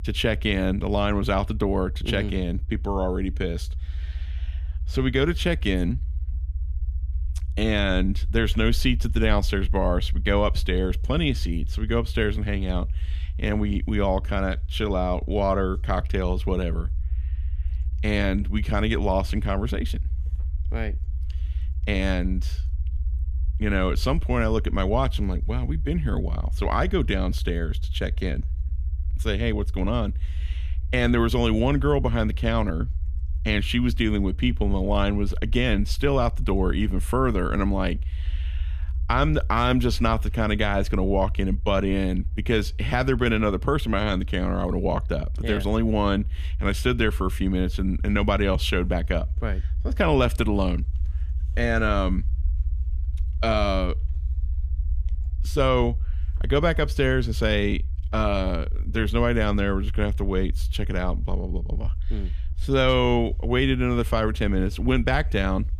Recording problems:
low rumble; faint; throughout; 25 dB below the speech

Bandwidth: 14.5 kHz